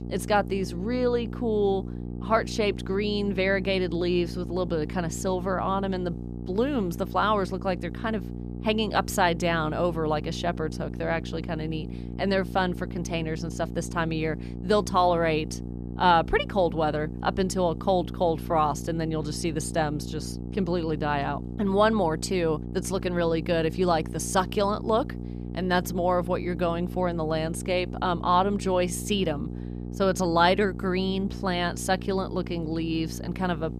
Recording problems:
electrical hum; noticeable; throughout; 60 Hz, 15 dB below the speech

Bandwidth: 14.5 kHz